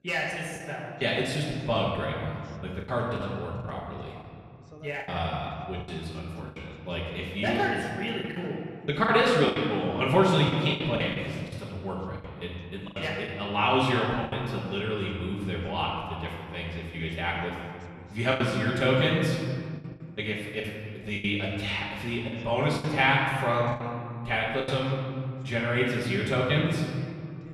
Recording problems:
off-mic speech; far
room echo; noticeable; dies away in 2.1 s
voice in the background; faint; throughout; 30 dB below the speech
choppy; very; 8% of the speech affected

